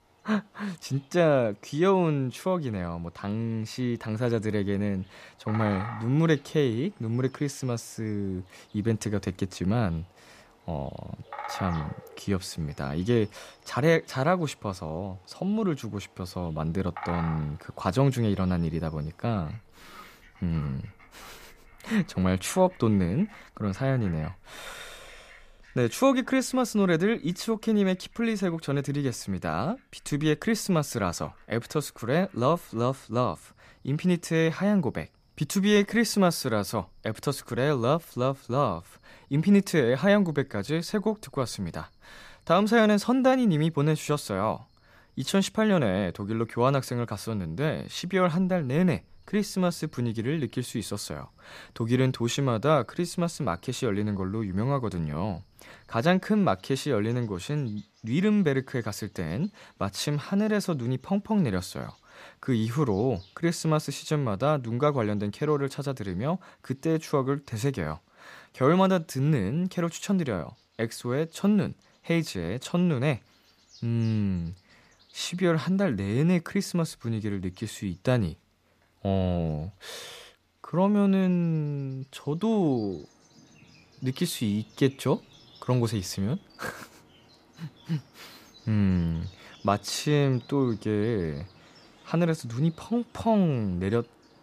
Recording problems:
animal sounds; faint; throughout; 25 dB below the speech

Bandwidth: 14.5 kHz